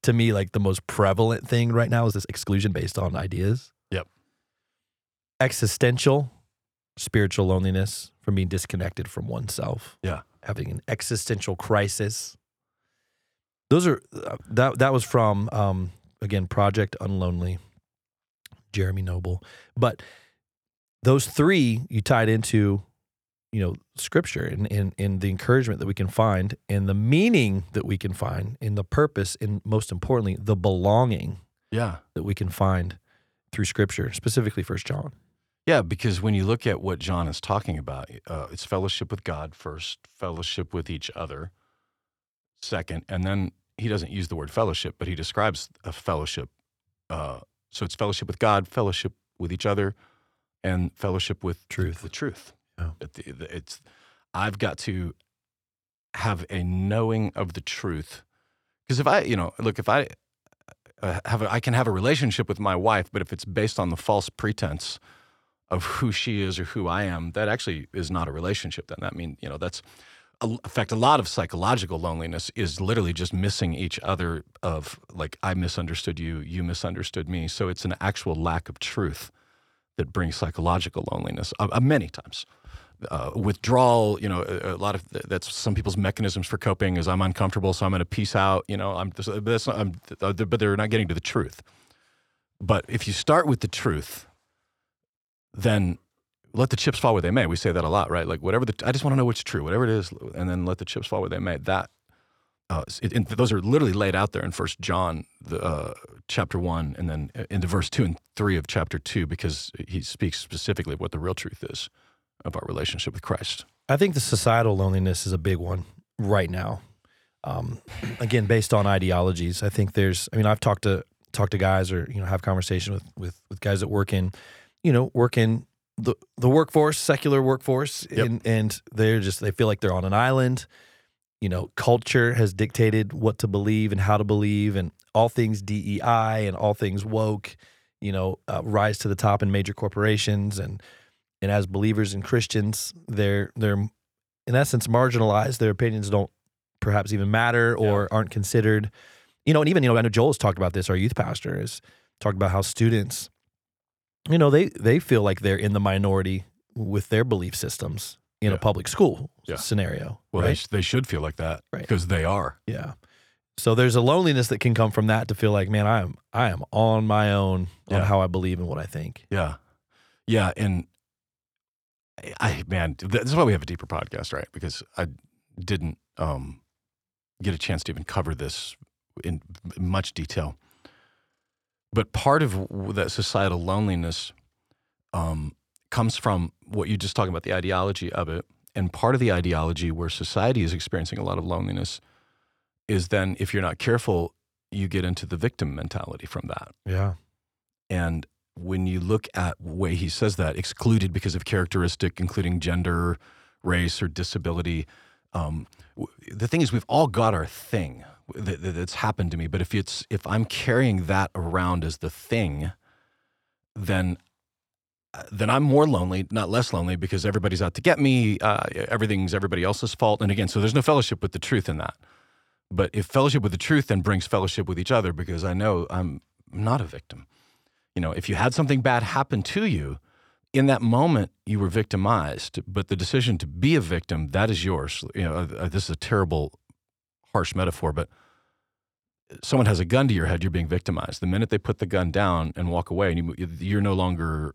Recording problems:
uneven, jittery; strongly; from 2 s to 2:30

